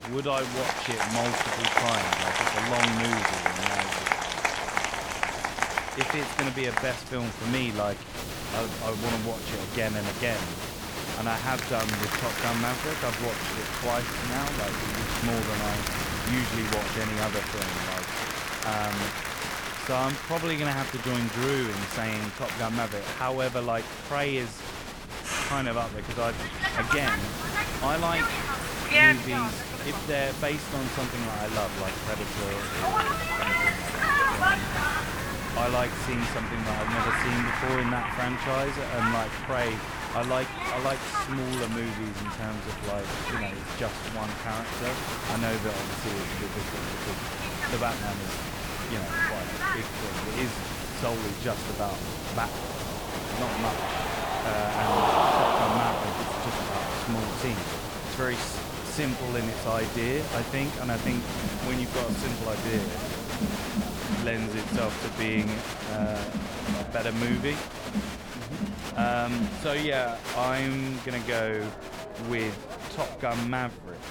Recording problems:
crowd noise; very loud; throughout; 2 dB above the speech
hiss; loud; from 8 to 17 s, from 27 to 36 s and from 45 s to 1:04; 5 dB below the speech
wind noise on the microphone; occasional gusts; 20 dB below the speech
electrical hum; faint; throughout; 60 Hz, 30 dB below the speech

